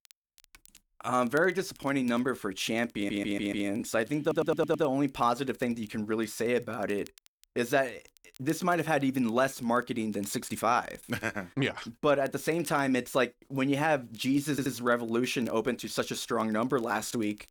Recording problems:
crackle, like an old record; faint; 30 dB below the speech
audio stuttering; at 3 s, at 4 s and at 15 s

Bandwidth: 19 kHz